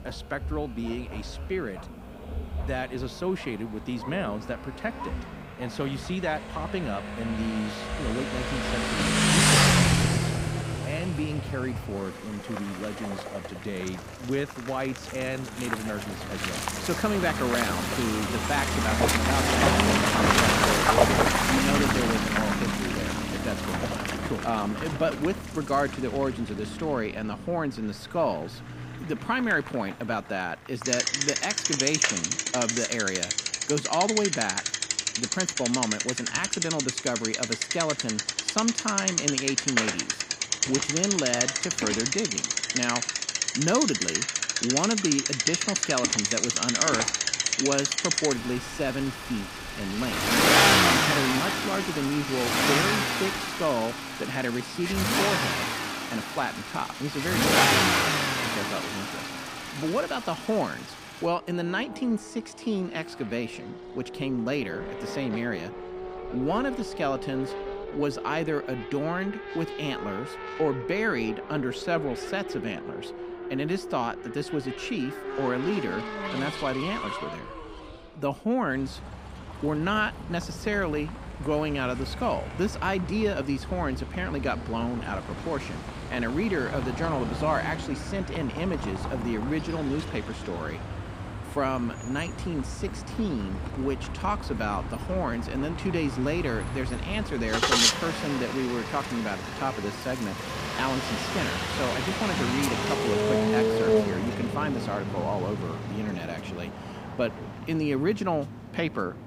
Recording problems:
traffic noise; very loud; throughout; 3 dB above the speech

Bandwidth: 15.5 kHz